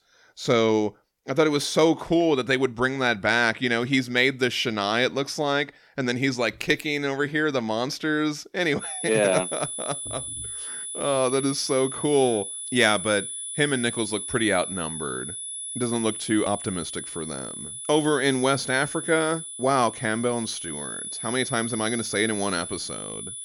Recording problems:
high-pitched whine; loud; from 9 s on; 10 kHz, 7 dB below the speech

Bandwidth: 17.5 kHz